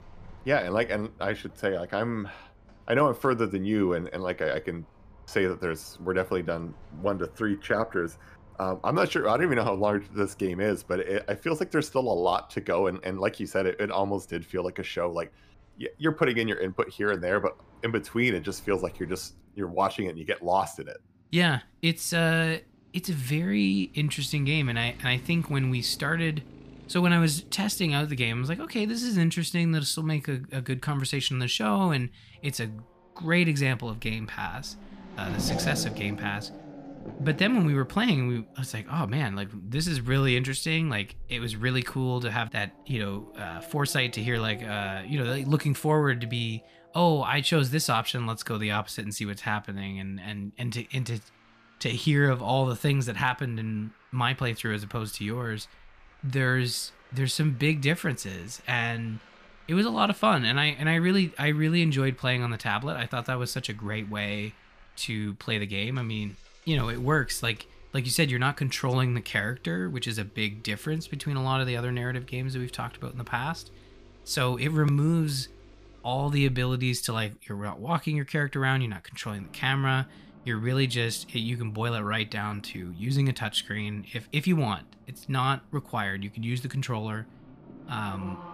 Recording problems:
traffic noise; faint; throughout; 20 dB below the speech

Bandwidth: 15 kHz